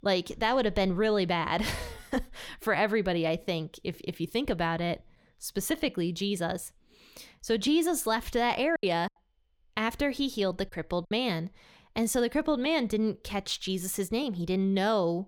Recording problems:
choppy; very; from 9 to 11 s; 7% of the speech affected

